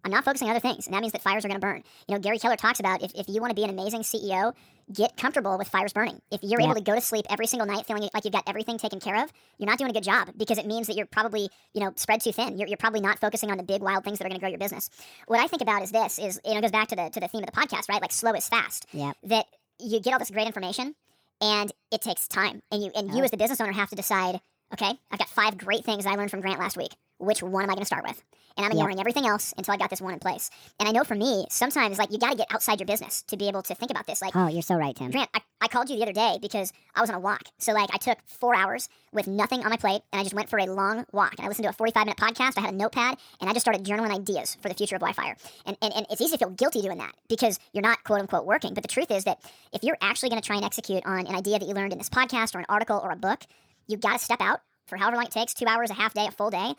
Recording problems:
wrong speed and pitch; too fast and too high; 1.5 times normal speed

